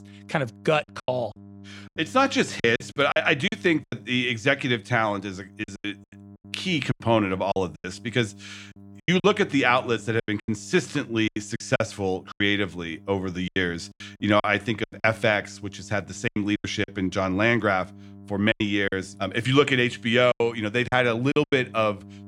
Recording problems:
electrical hum; faint; throughout; 50 Hz, 30 dB below the speech
choppy; very; 11% of the speech affected

